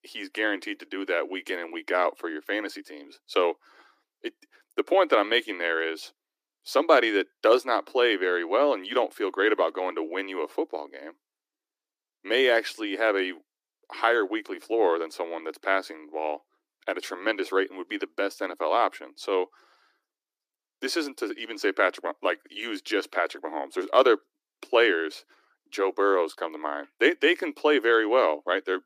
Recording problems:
thin; somewhat; fading below 300 Hz

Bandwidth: 15 kHz